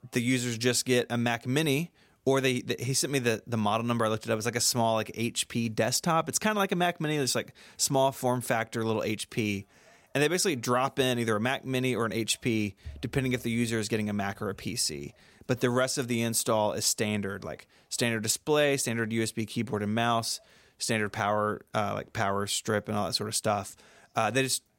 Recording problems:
none

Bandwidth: 16 kHz